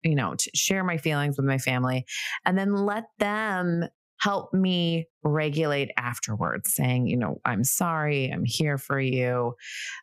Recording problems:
squashed, flat; heavily

